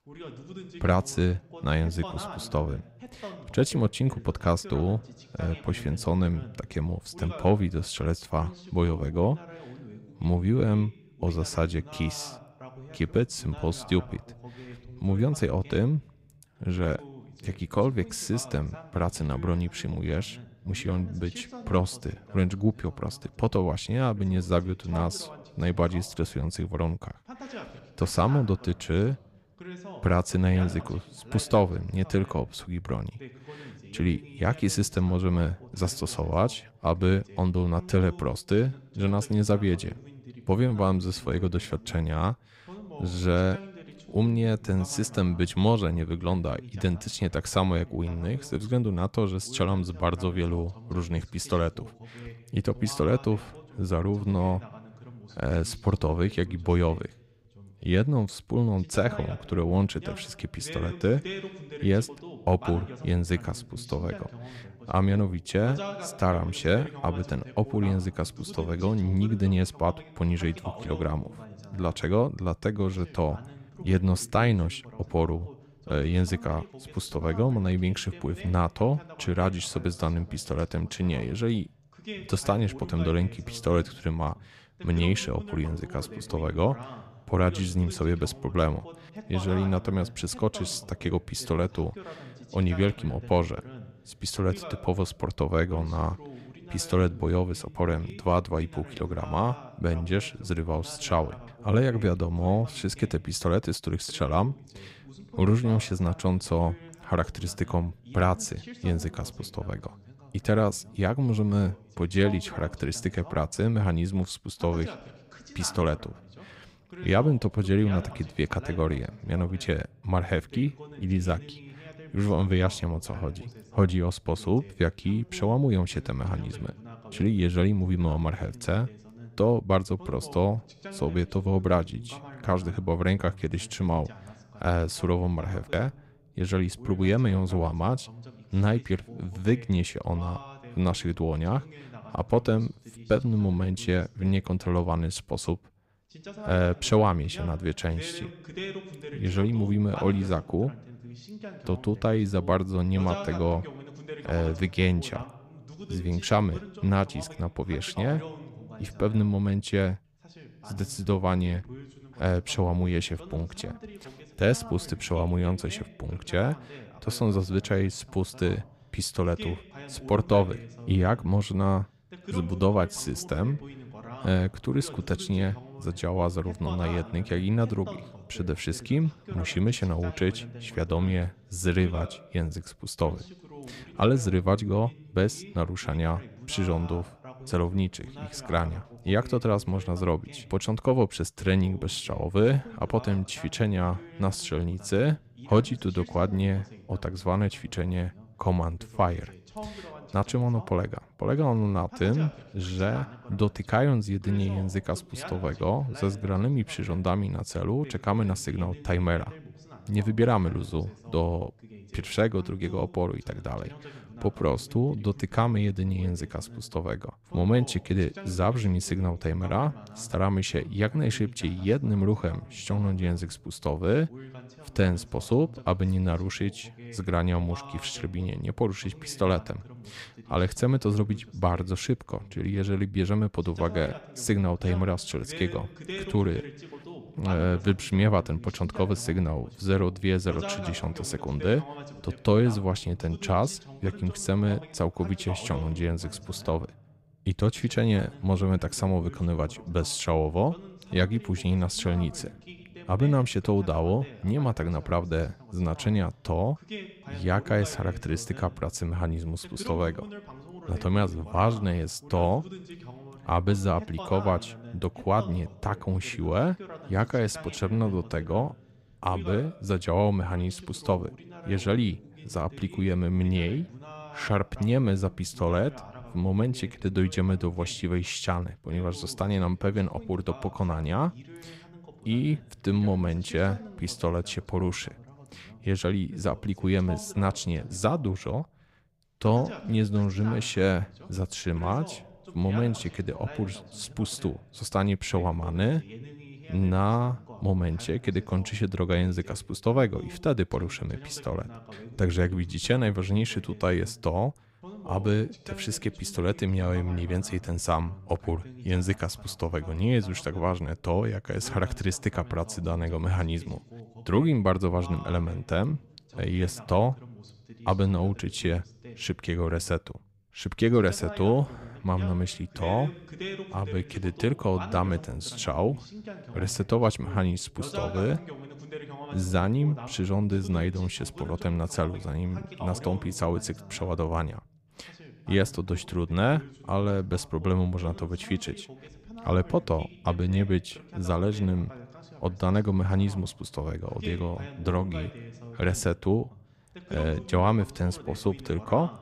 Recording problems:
voice in the background; noticeable; throughout; 15 dB below the speech

